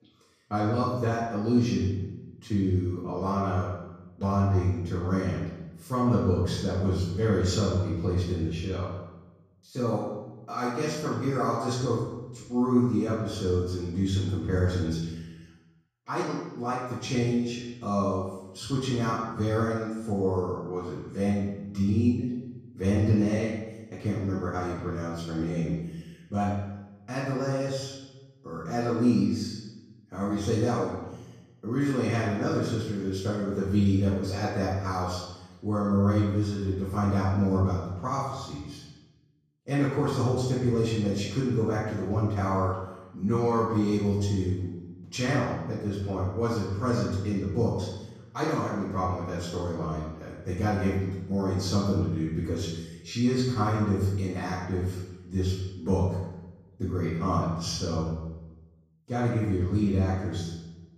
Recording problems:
off-mic speech; far
room echo; noticeable; dies away in 1 s

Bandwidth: 15 kHz